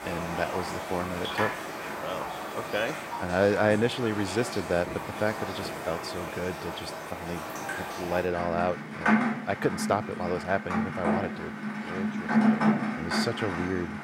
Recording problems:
rain or running water; loud; throughout; 1 dB below the speech

